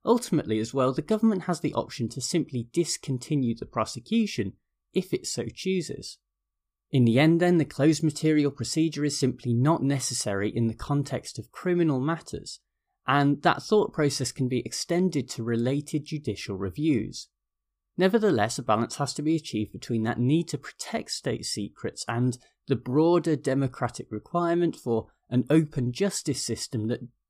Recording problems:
none

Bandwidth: 15 kHz